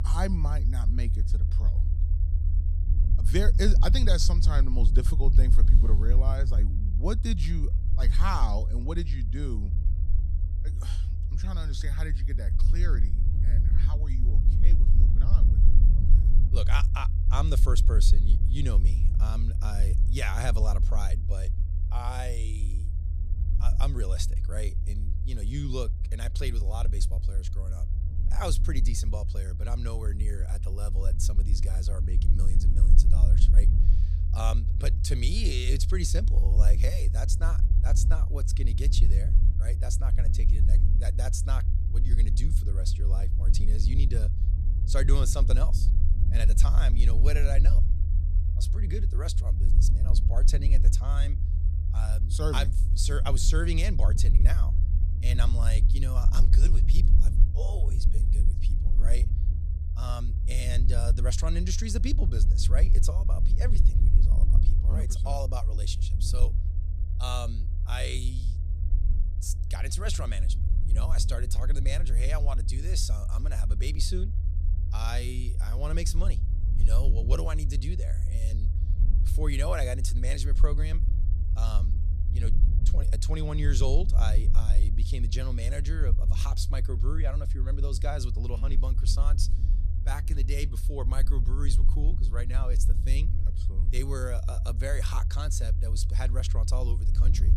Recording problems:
low rumble; loud; throughout; 8 dB below the speech
electrical hum; faint; throughout; 60 Hz, 30 dB below the speech

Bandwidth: 14 kHz